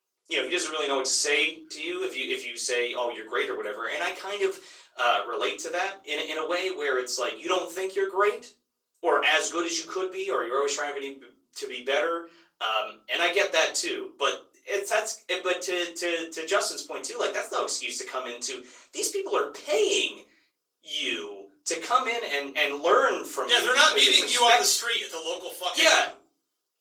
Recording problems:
off-mic speech; far
thin; very; fading below 400 Hz
room echo; slight; dies away in 0.5 s
garbled, watery; slightly

